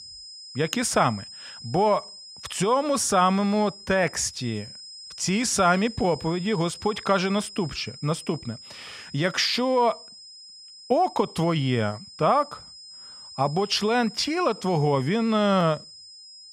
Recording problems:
high-pitched whine; noticeable; throughout; 5 kHz, 15 dB below the speech

